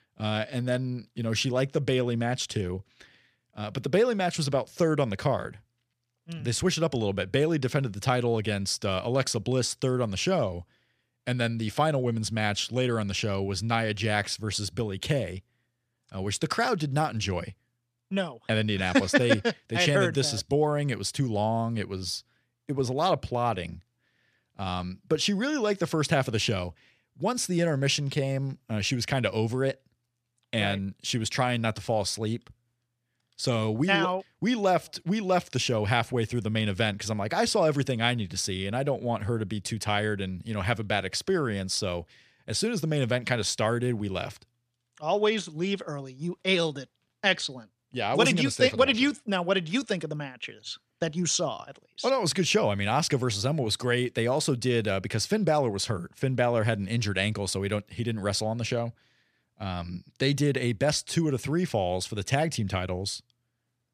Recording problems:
none

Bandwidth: 14.5 kHz